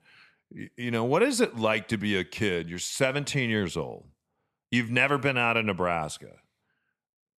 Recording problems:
none

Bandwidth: 13.5 kHz